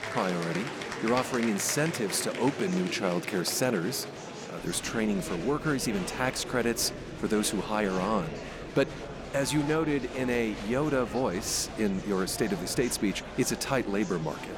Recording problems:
murmuring crowd; loud; throughout; 9 dB below the speech

